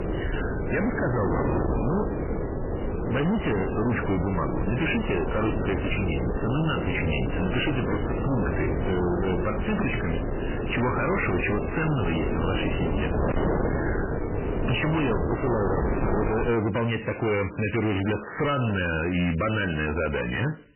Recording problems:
distortion; heavy; 35% of the sound clipped
garbled, watery; badly; nothing above 3 kHz
wind noise on the microphone; heavy; until 16 s; 3 dB below the speech
crackling; faint; from 14 to 17 s; 25 dB below the speech

